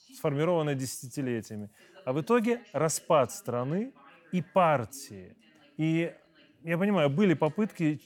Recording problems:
voice in the background; faint; throughout; 30 dB below the speech

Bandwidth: 17.5 kHz